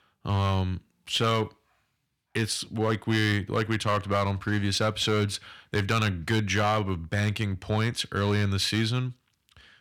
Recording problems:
distortion; slight; 4% of the sound clipped

